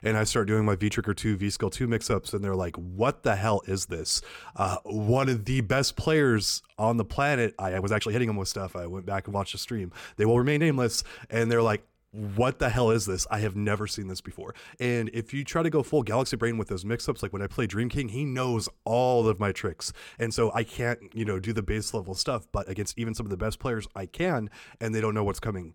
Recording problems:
uneven, jittery; strongly; from 2 to 24 s

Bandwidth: 18 kHz